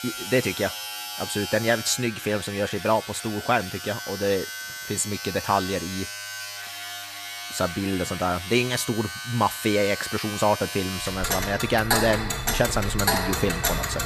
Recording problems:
household noises; loud; throughout; 4 dB below the speech

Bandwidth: 14.5 kHz